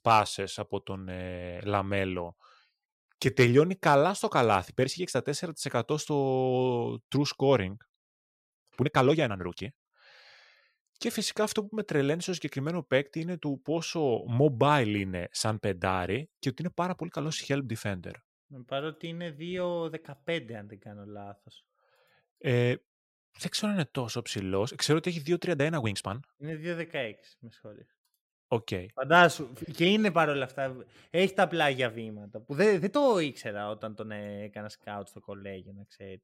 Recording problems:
uneven, jittery; strongly; from 3 to 33 s

